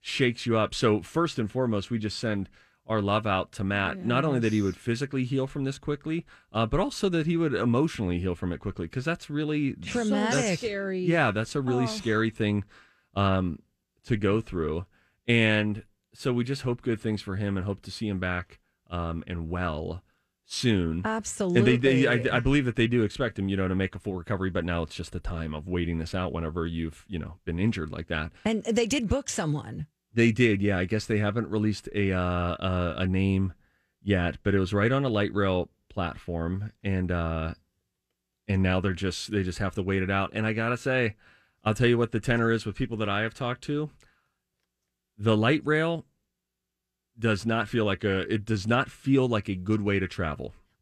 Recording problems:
none

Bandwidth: 14.5 kHz